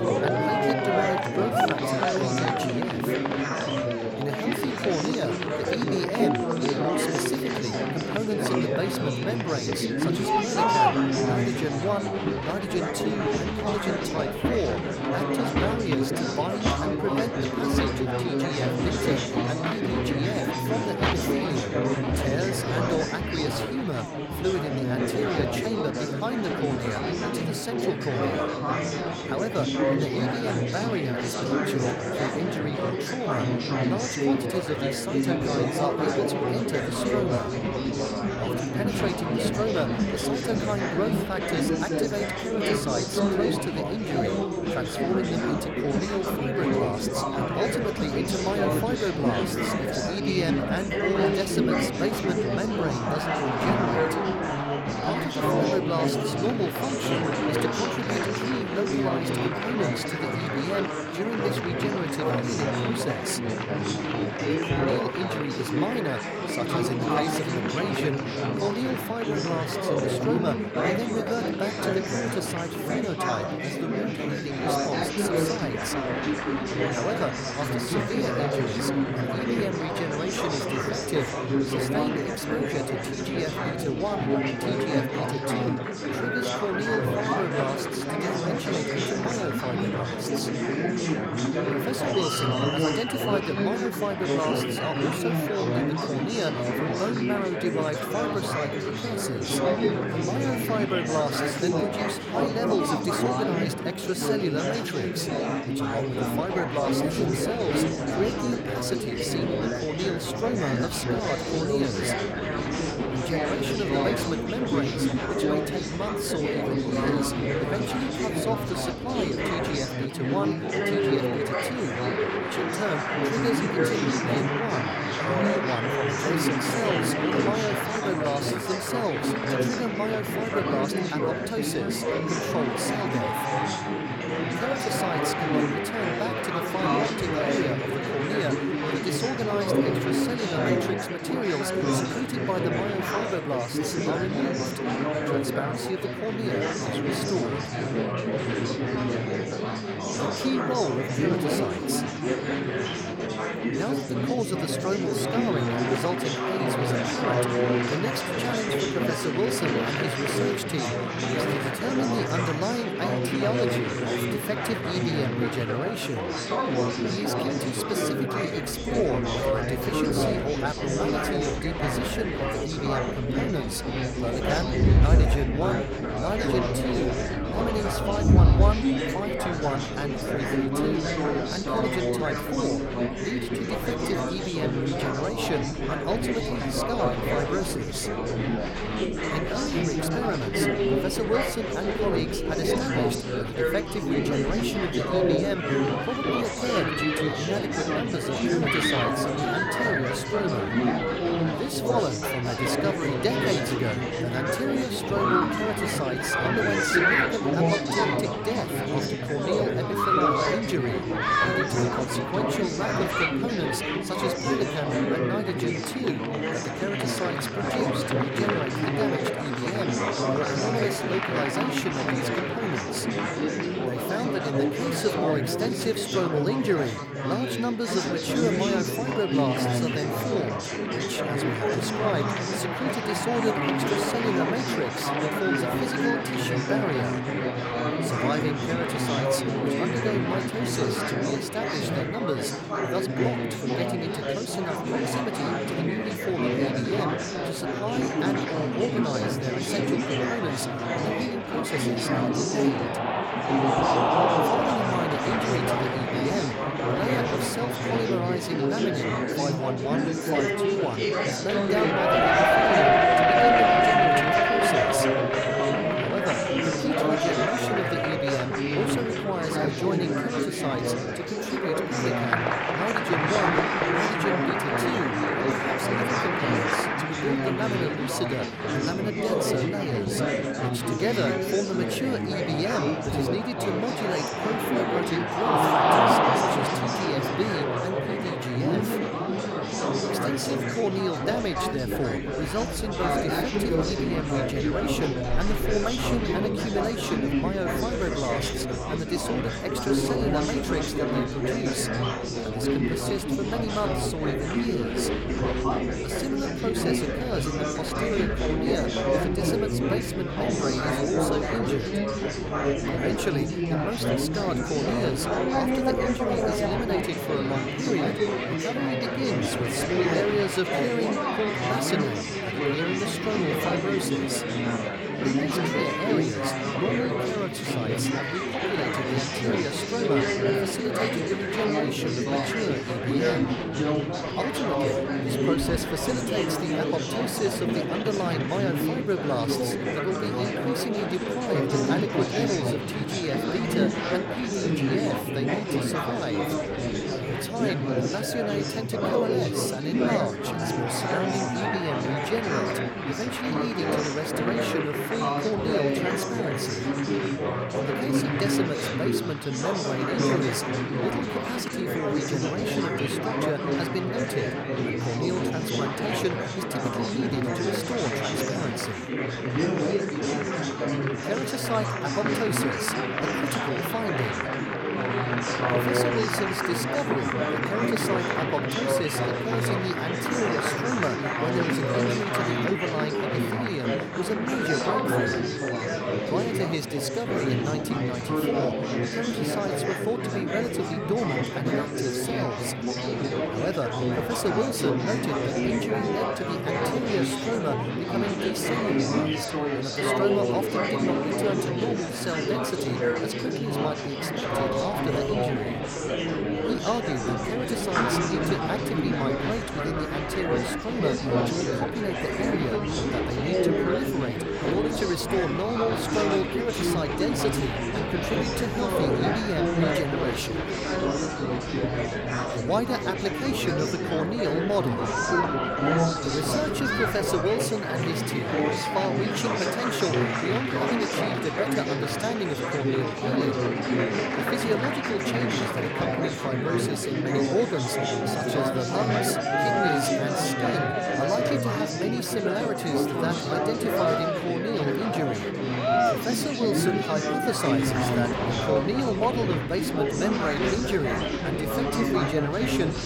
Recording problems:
chatter from many people; very loud; throughout; 5 dB above the speech

